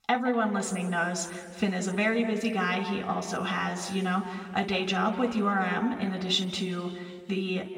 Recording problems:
off-mic speech; far
room echo; noticeable; dies away in 1.7 s

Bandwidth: 16 kHz